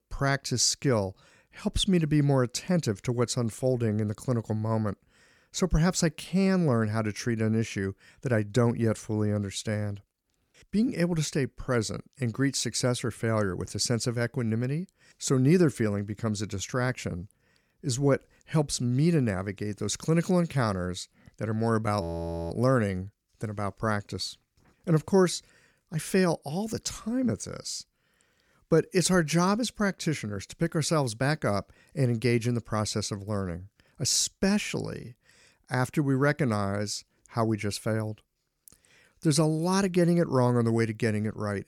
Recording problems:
audio freezing; at 22 s

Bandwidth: 18.5 kHz